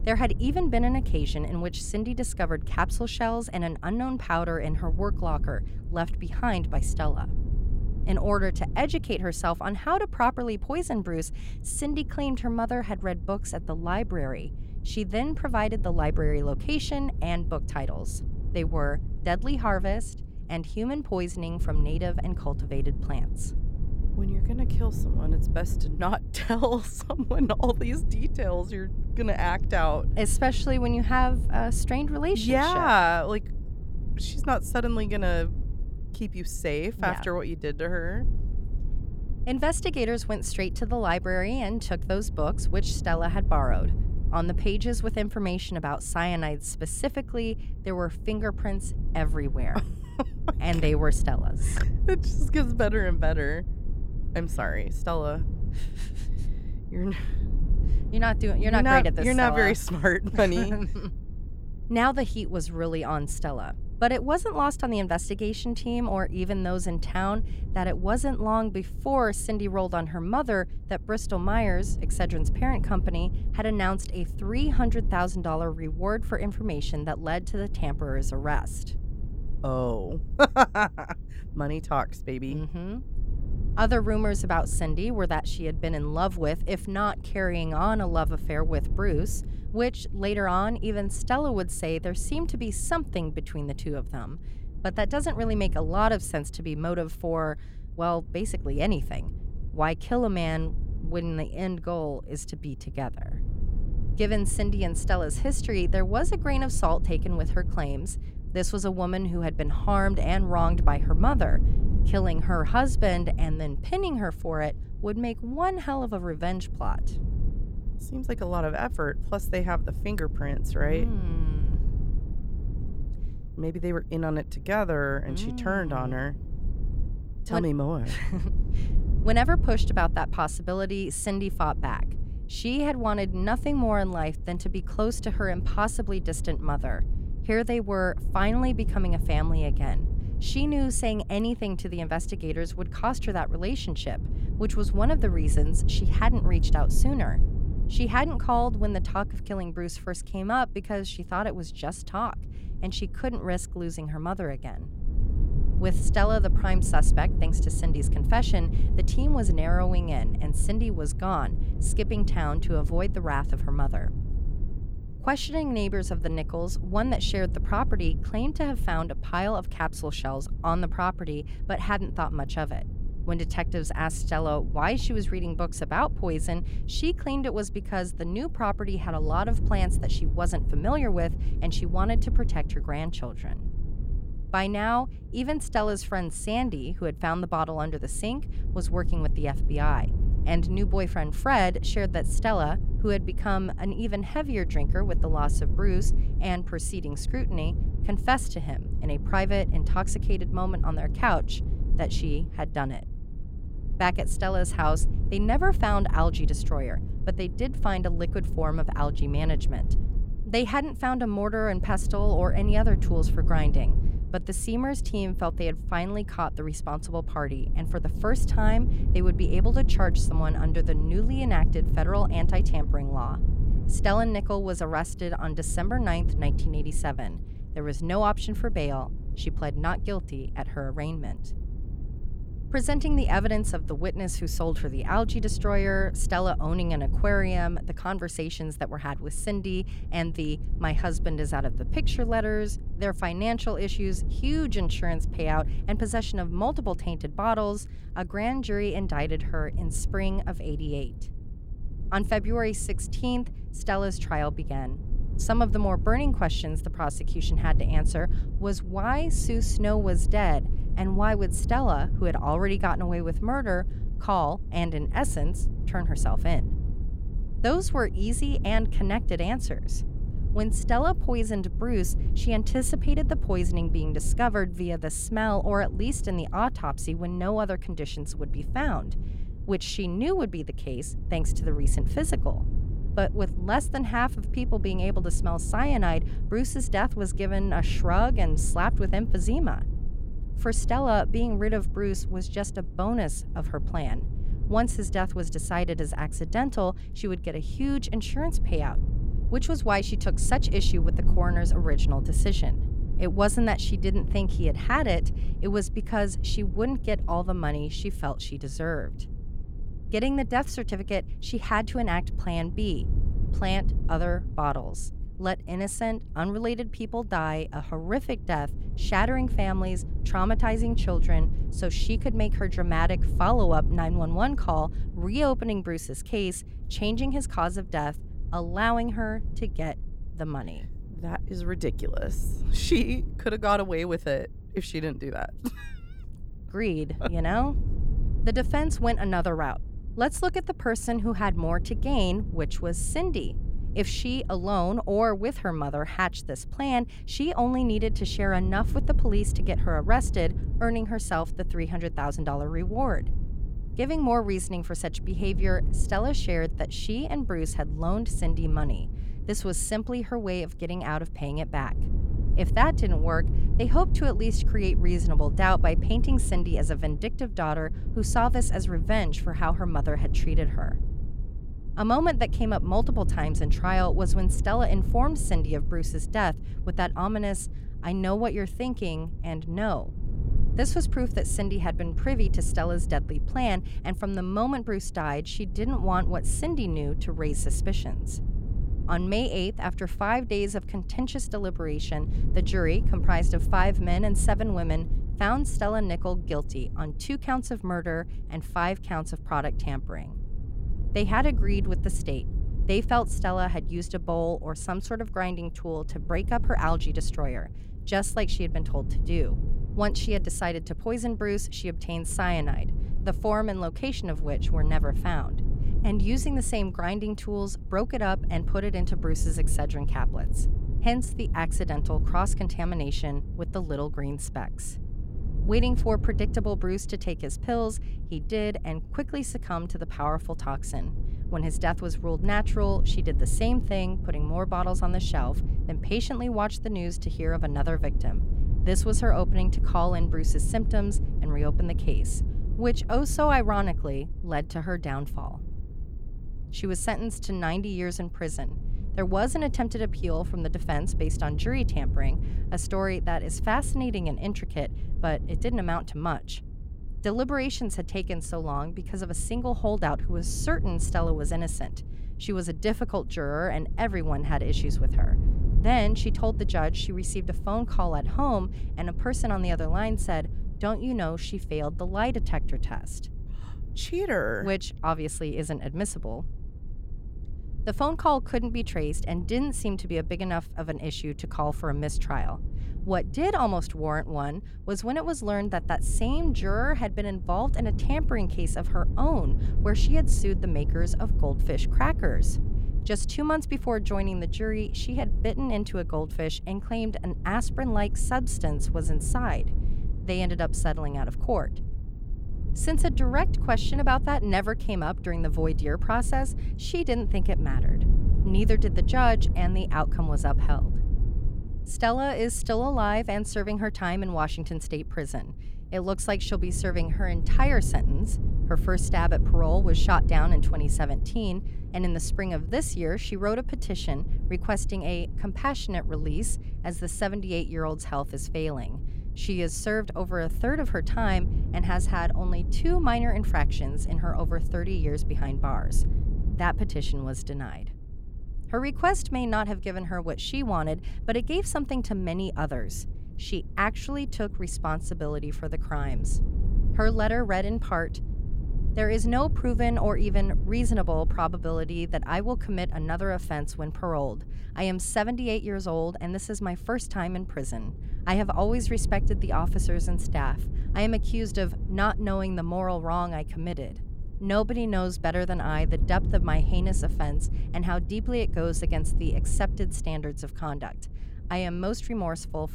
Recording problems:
low rumble; noticeable; throughout; 15 dB below the speech

